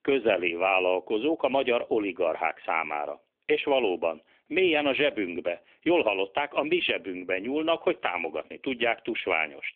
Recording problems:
phone-call audio; nothing above 3.5 kHz

